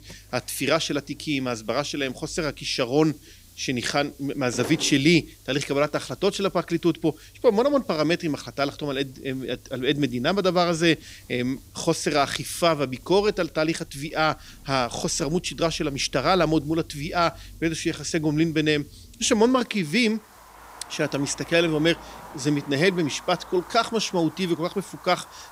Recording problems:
traffic noise; faint; throughout; 25 dB below the speech
hiss; faint; throughout; 30 dB below the speech

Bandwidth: 15.5 kHz